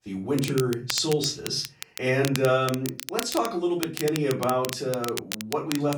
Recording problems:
off-mic speech; far
room echo; slight; dies away in 0.3 s
crackle, like an old record; loud; 9 dB below the speech

